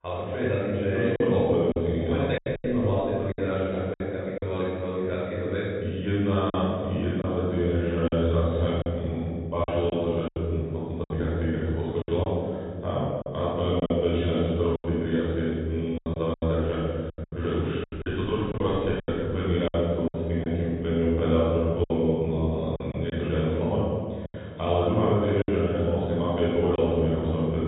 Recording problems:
room echo; strong; dies away in 2.3 s
off-mic speech; far
high frequencies cut off; severe; nothing above 4 kHz
choppy; very; 7% of the speech affected

